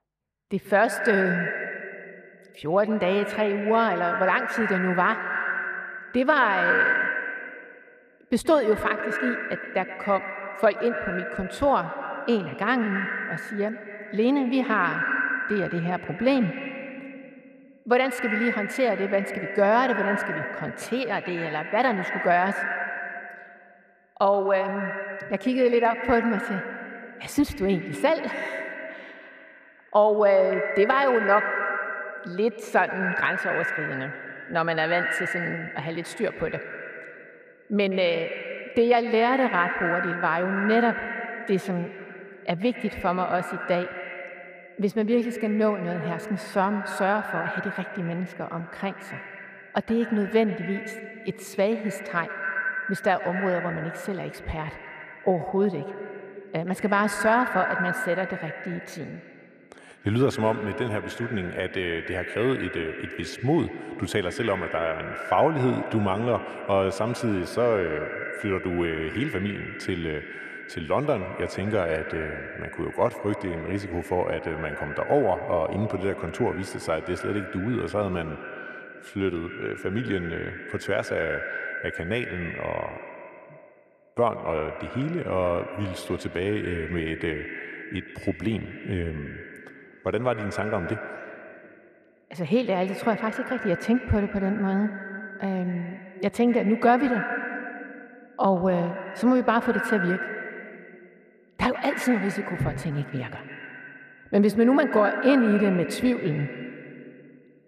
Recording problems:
echo of what is said; strong; throughout; 120 ms later, 6 dB below the speech
muffled; slightly; fading above 3 kHz

